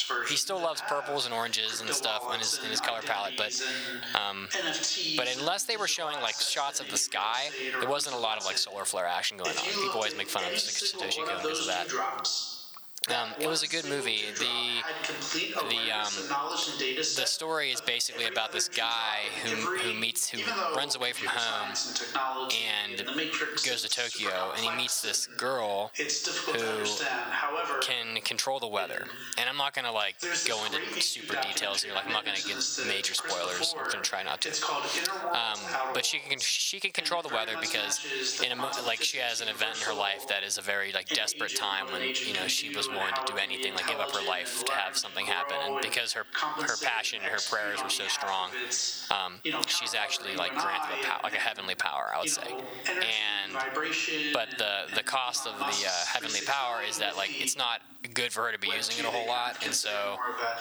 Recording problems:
thin; very; fading below 850 Hz
squashed, flat; heavily, background pumping
voice in the background; loud; throughout; 3 dB below the speech

